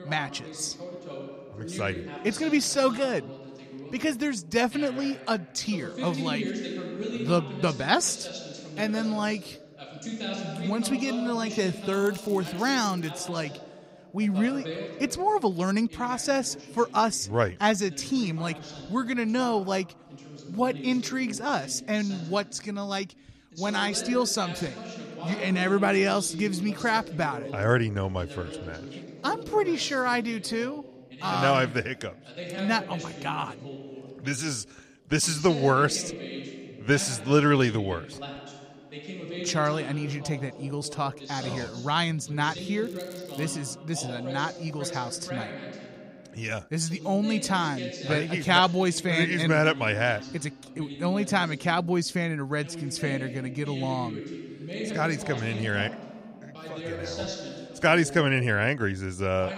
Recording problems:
voice in the background; noticeable; throughout; 10 dB below the speech
crackling; faint; from 12 to 13 s and at 43 s; 25 dB below the speech

